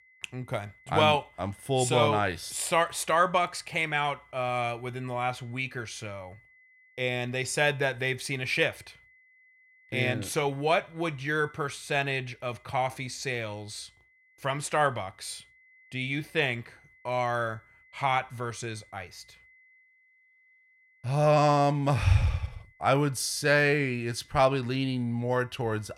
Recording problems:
high-pitched whine; faint; throughout; 2 kHz, 30 dB below the speech

